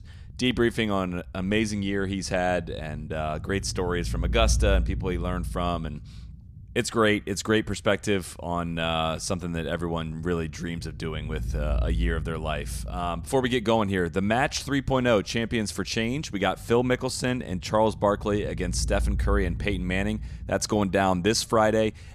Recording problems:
low rumble; faint; throughout; 25 dB below the speech

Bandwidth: 14.5 kHz